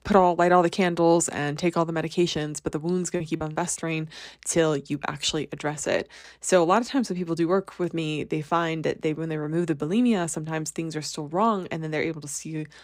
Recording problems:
choppy; occasionally; from 3 to 6 s; 4% of the speech affected

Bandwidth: 15.5 kHz